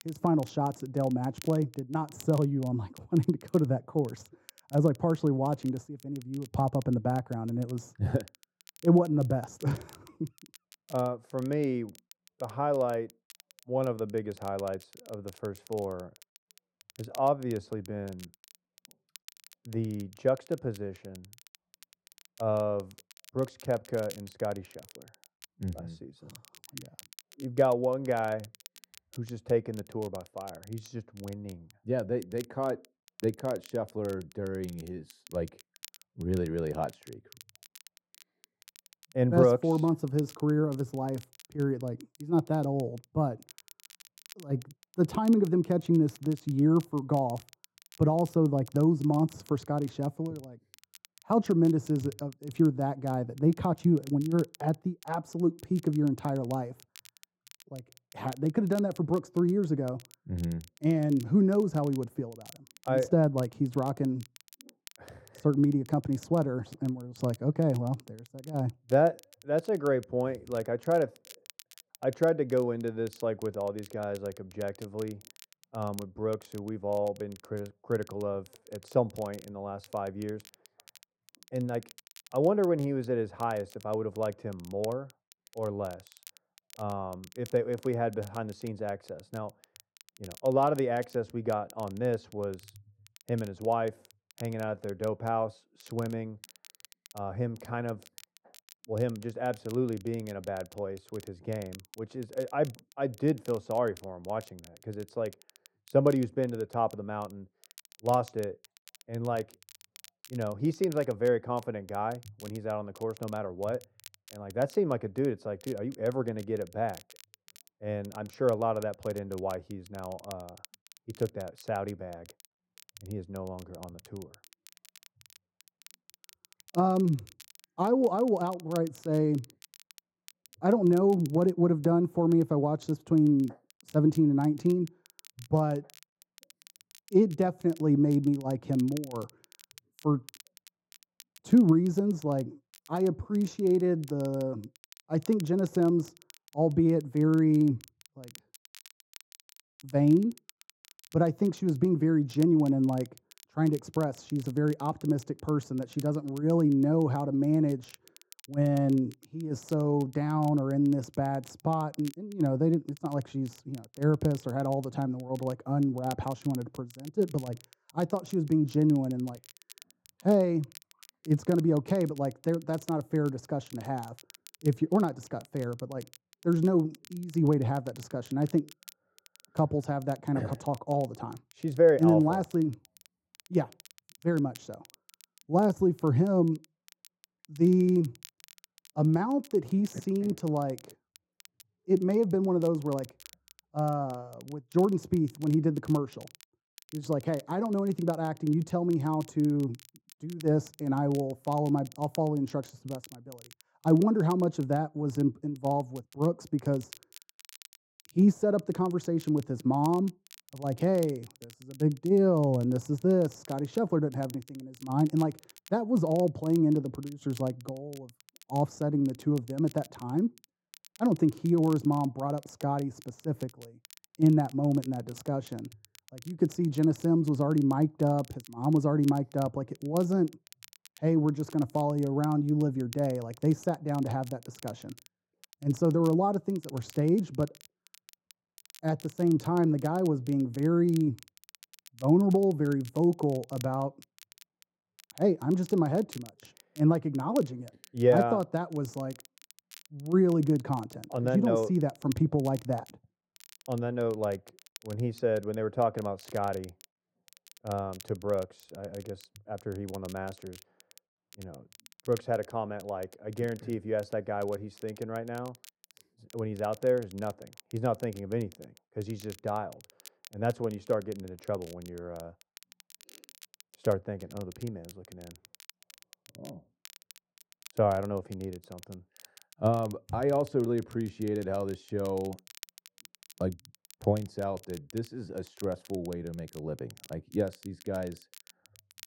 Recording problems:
muffled; very; fading above 1.5 kHz
crackle, like an old record; faint; 25 dB below the speech

